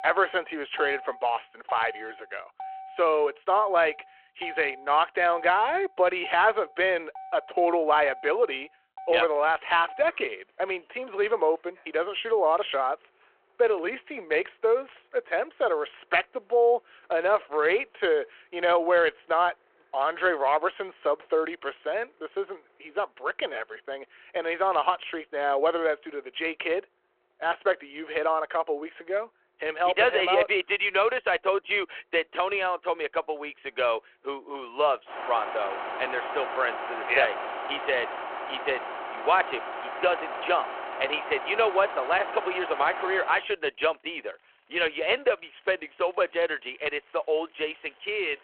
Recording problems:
phone-call audio
traffic noise; noticeable; throughout; 10 dB below the speech

